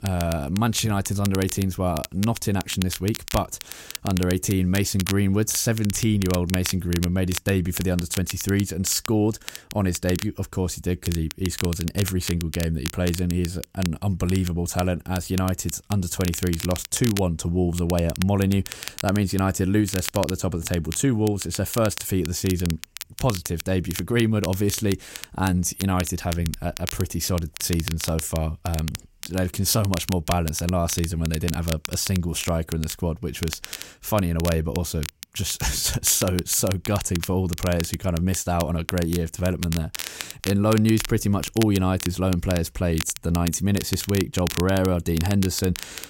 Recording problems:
crackle, like an old record; noticeable; 10 dB below the speech

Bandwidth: 16 kHz